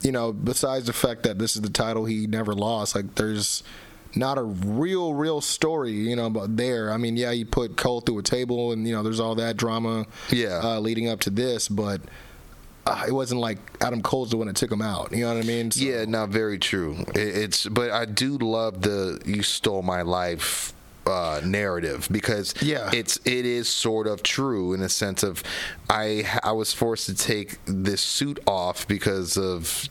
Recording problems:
squashed, flat; heavily

